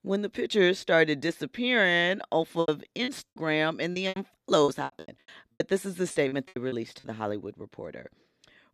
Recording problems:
choppy; very; from 2.5 to 7 s; 24% of the speech affected

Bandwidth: 14 kHz